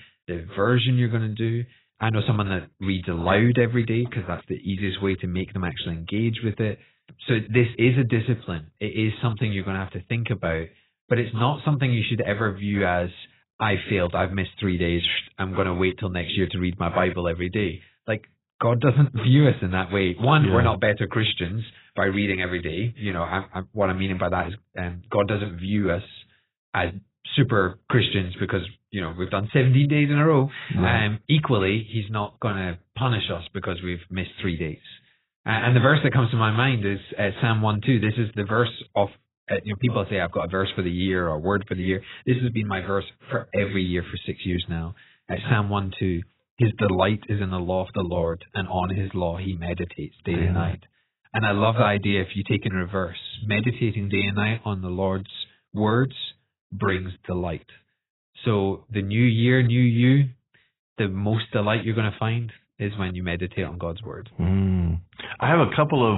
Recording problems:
garbled, watery; badly; nothing above 4 kHz
abrupt cut into speech; at the end

